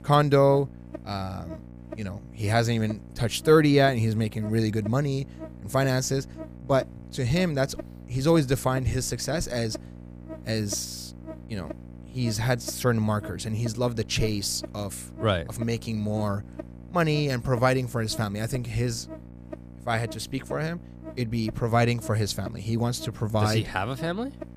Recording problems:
electrical hum; noticeable; throughout; 60 Hz, 15 dB below the speech

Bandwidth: 15 kHz